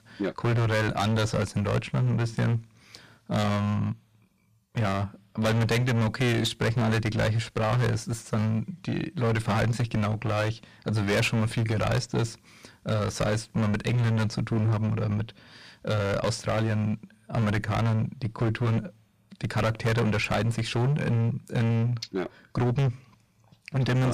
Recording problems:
distortion; heavy; 17% of the sound clipped
abrupt cut into speech; at the end

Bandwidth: 14.5 kHz